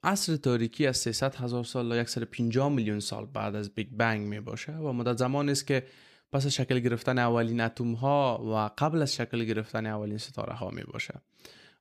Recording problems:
none

